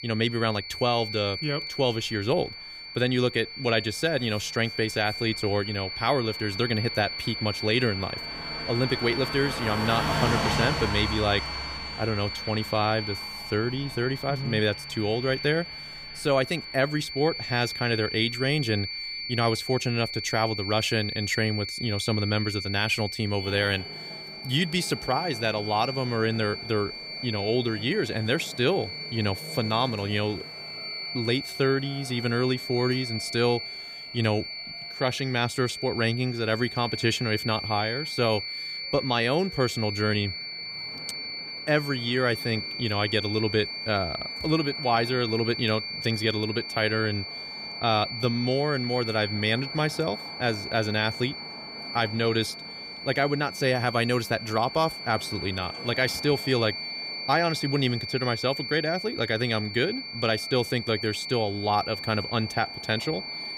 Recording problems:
high-pitched whine; loud; throughout; 4.5 kHz, 7 dB below the speech
traffic noise; noticeable; throughout; 15 dB below the speech

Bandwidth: 15.5 kHz